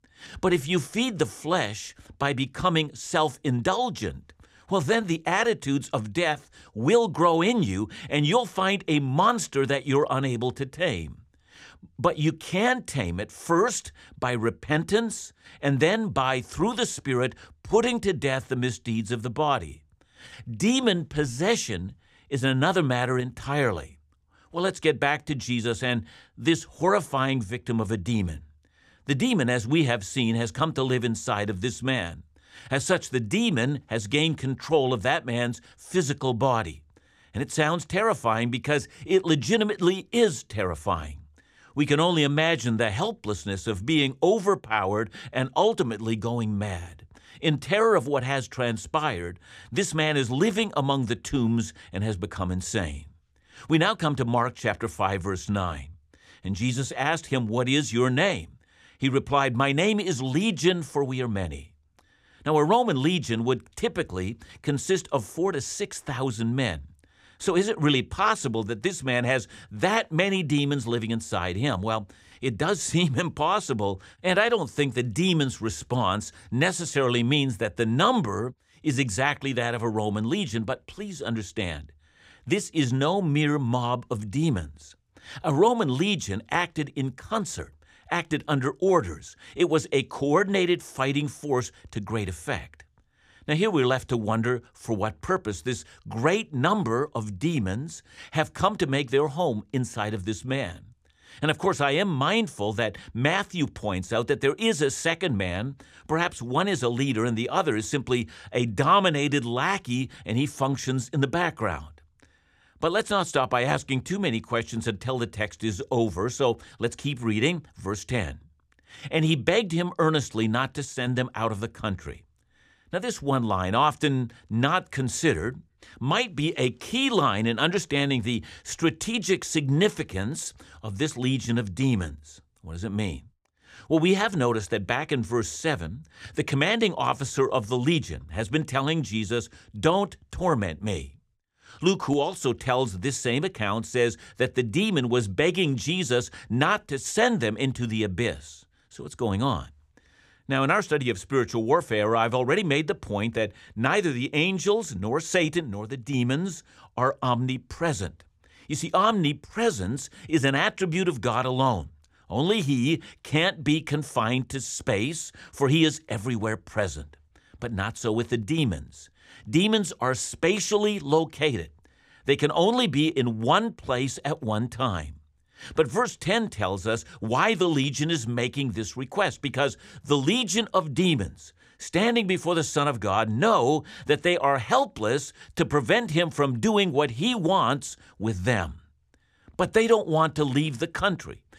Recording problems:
none

